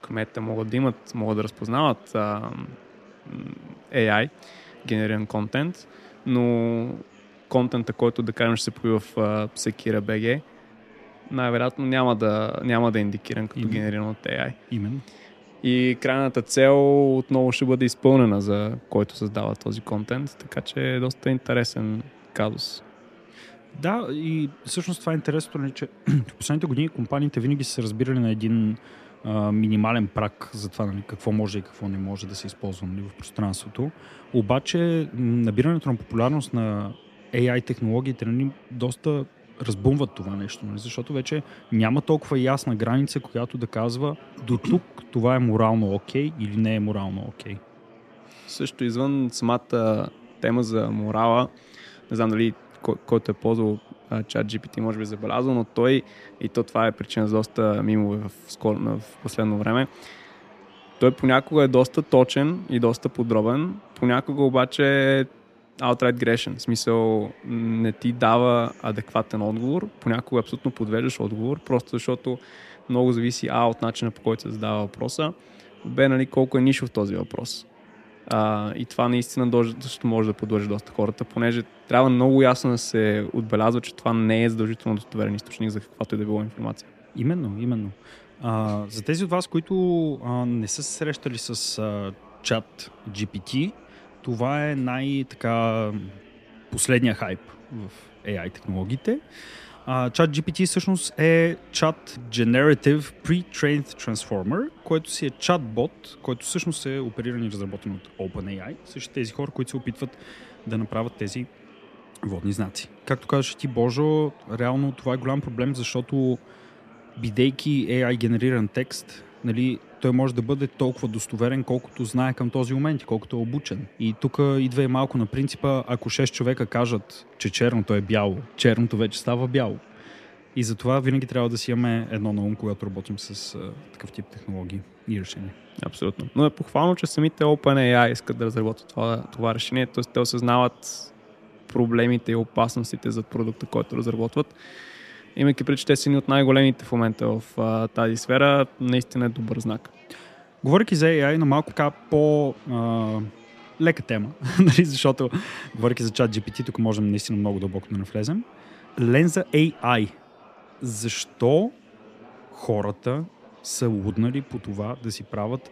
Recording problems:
murmuring crowd; faint; throughout; 25 dB below the speech

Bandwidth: 14.5 kHz